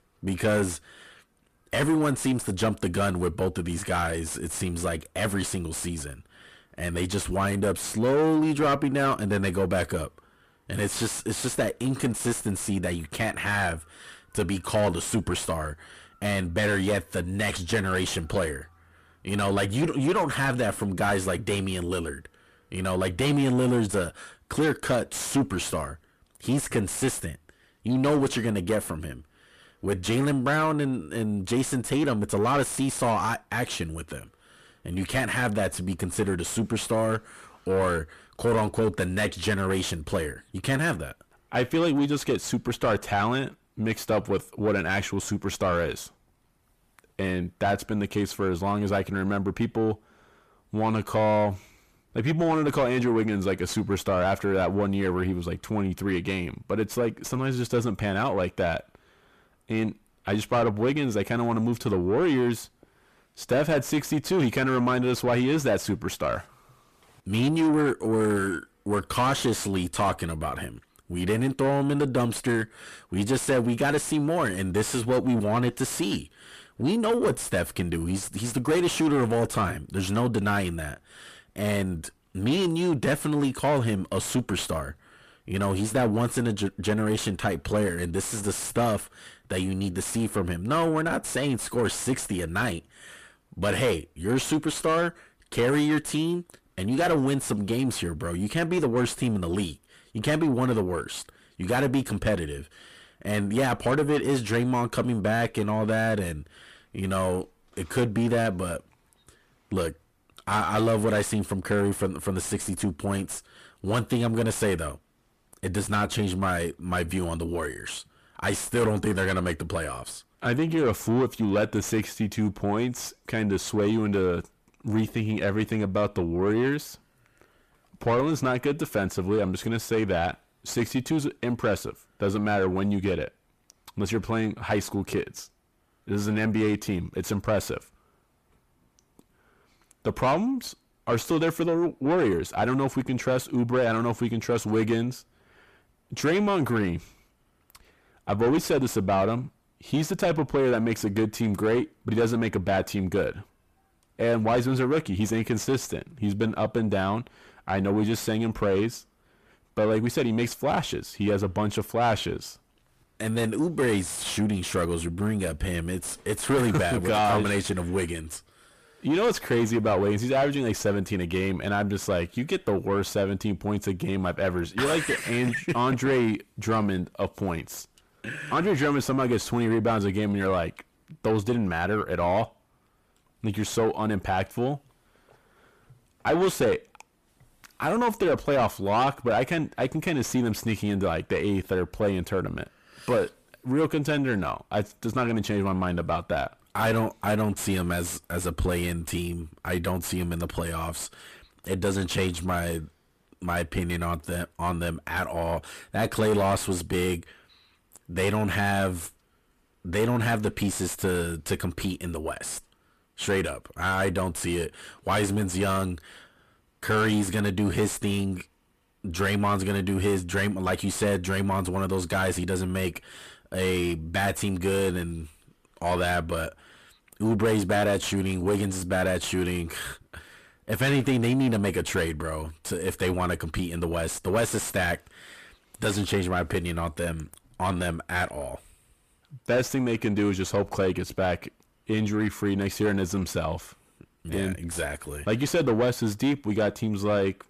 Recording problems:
distortion; heavy; 7 dB below the speech

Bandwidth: 14.5 kHz